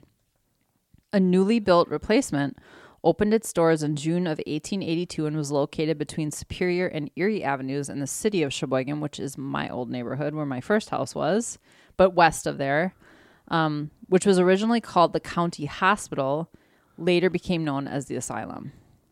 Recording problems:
none

